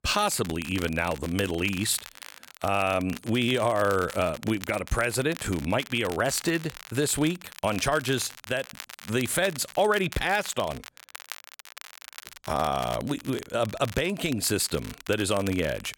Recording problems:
crackle, like an old record; noticeable; 15 dB below the speech

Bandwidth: 17 kHz